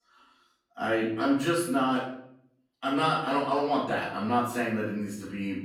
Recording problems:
off-mic speech; far
room echo; noticeable; dies away in 0.6 s

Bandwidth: 17 kHz